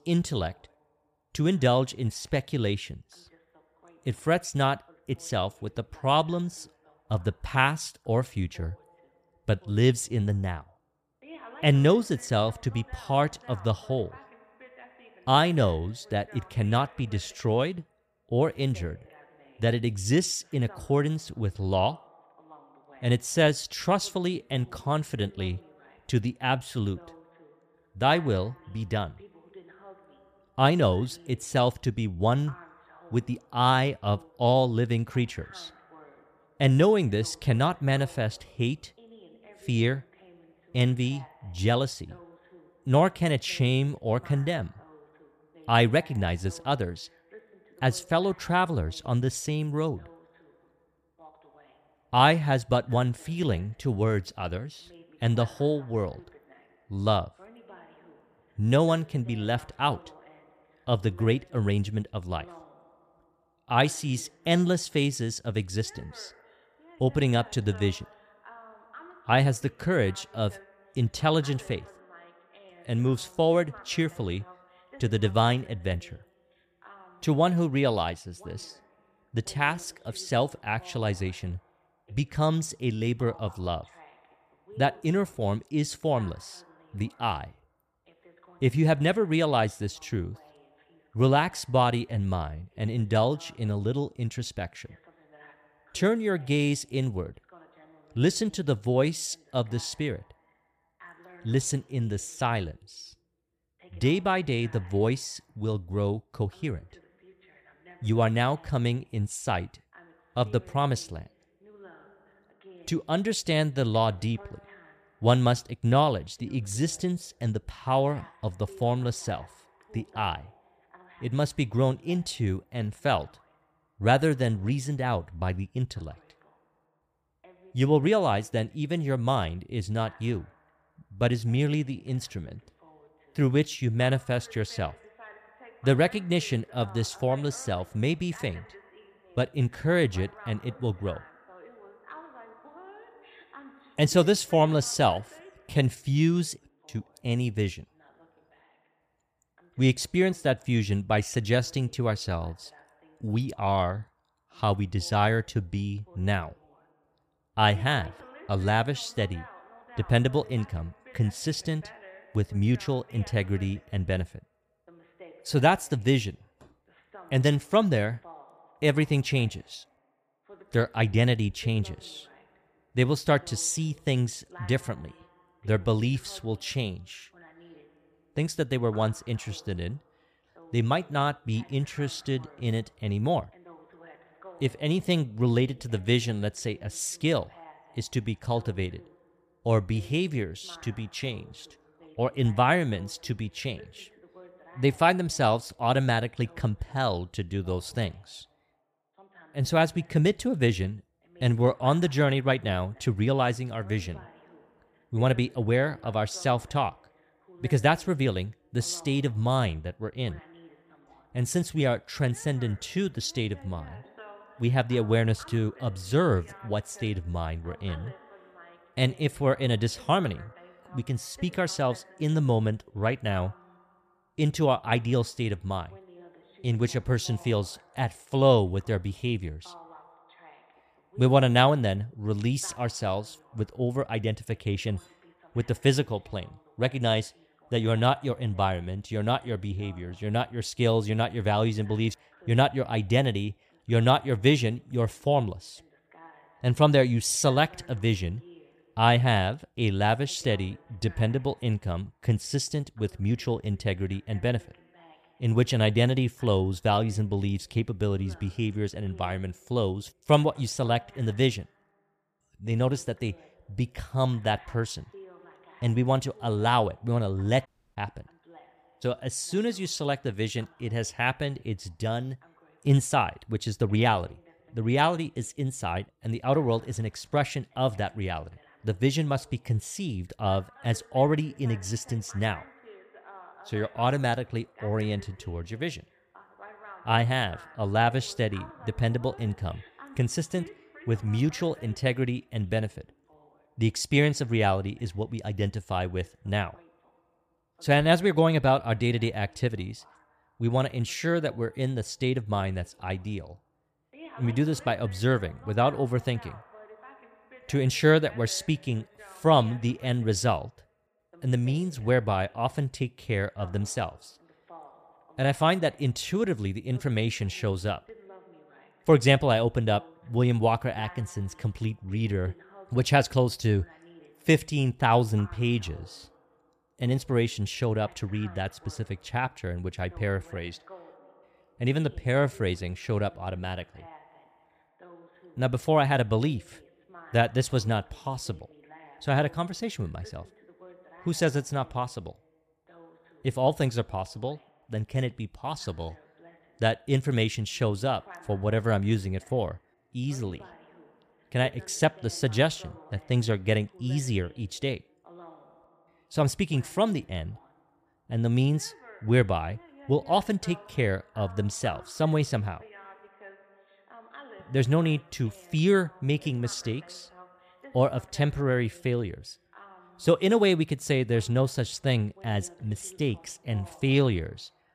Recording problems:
voice in the background; faint; throughout; 25 dB below the speech
audio cutting out; at 4:28

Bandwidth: 14.5 kHz